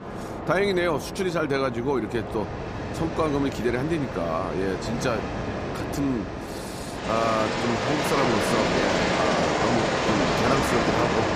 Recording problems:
train or aircraft noise; very loud; throughout; as loud as the speech

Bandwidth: 15 kHz